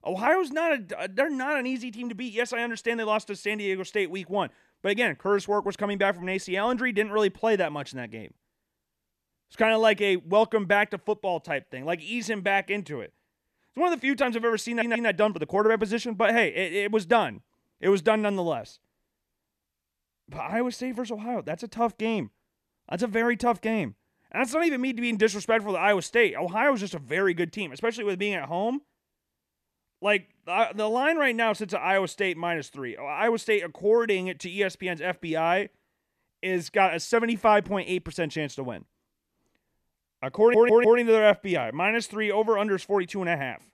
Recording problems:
audio stuttering; at 15 s and at 40 s

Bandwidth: 13.5 kHz